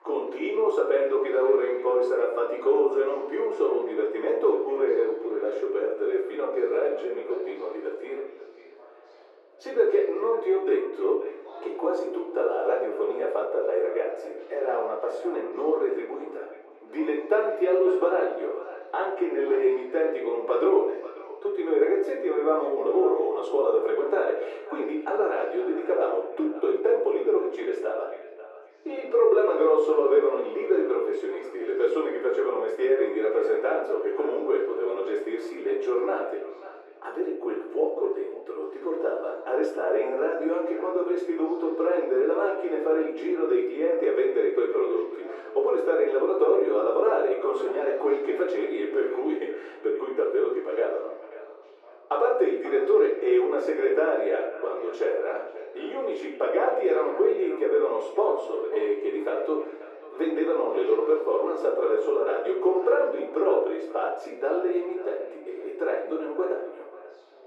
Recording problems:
off-mic speech; far
muffled; very; fading above 1.5 kHz
thin; very; fading below 350 Hz
echo of what is said; noticeable; throughout; 540 ms later, 15 dB below the speech
room echo; noticeable; dies away in 0.6 s
chatter from many people; faint; throughout; 25 dB below the speech

